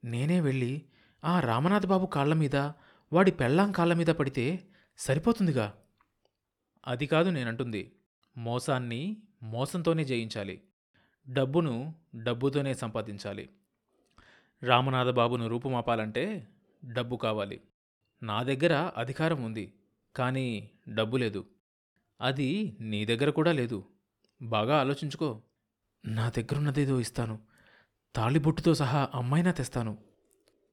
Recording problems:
none

